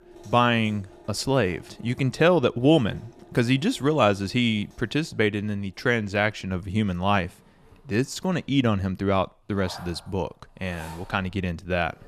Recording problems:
household noises; faint; throughout; 25 dB below the speech

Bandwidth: 14 kHz